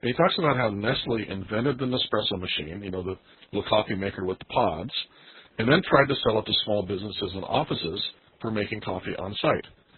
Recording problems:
garbled, watery; badly; nothing above 4 kHz

